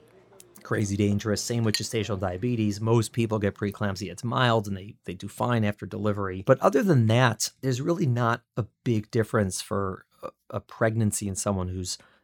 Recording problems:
household noises; loud; until 4.5 s; 6 dB below the speech

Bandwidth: 17.5 kHz